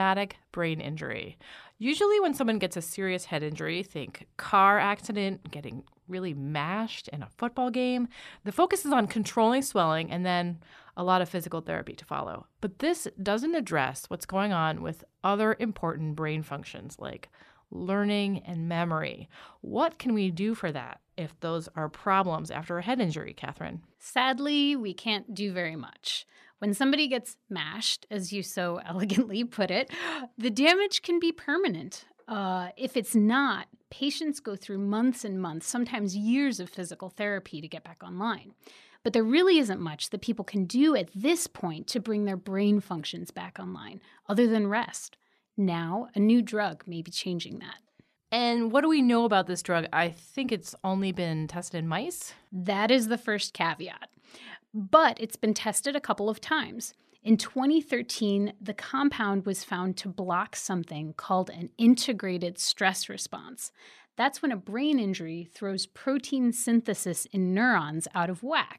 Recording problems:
abrupt cut into speech; at the start

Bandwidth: 14 kHz